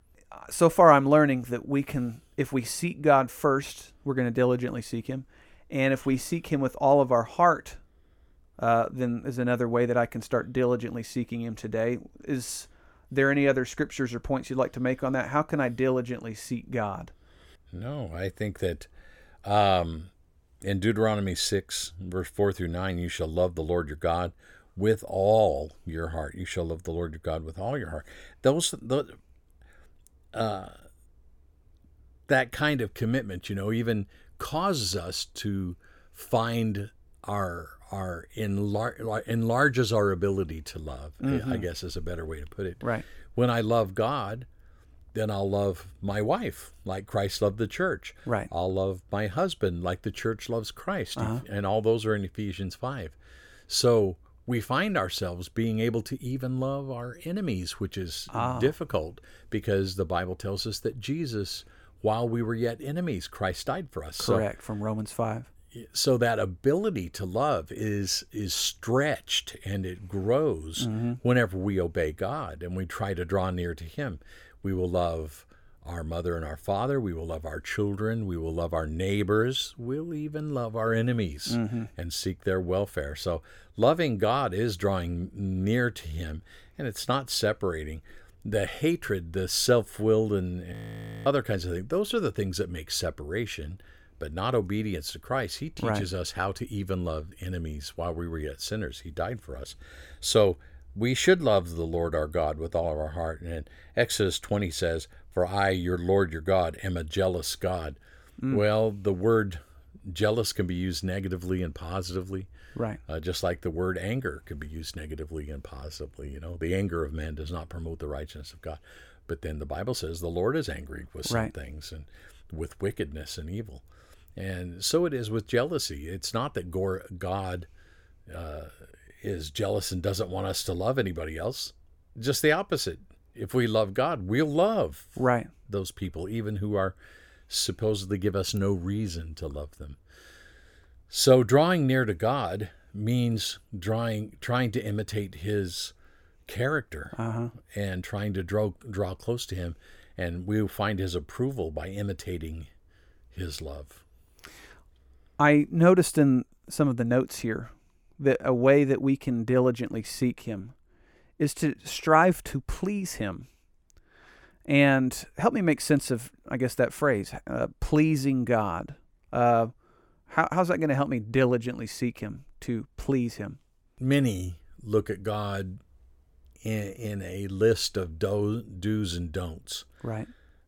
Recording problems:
audio freezing; at 1:31 for 0.5 s

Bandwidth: 17 kHz